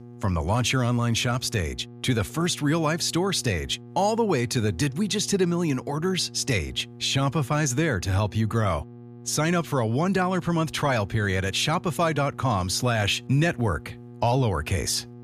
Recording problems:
electrical hum; faint; throughout; 60 Hz, 25 dB below the speech

